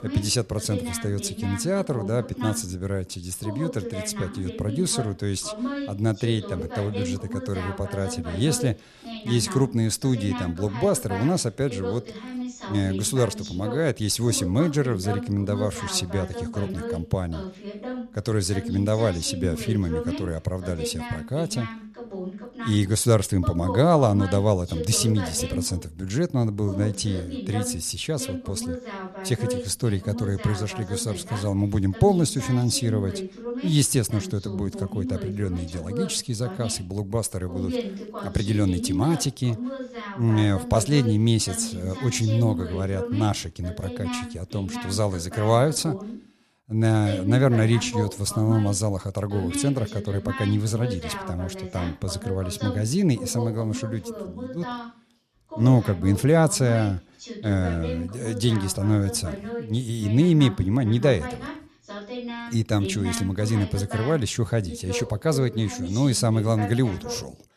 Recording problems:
voice in the background; loud; throughout; 10 dB below the speech

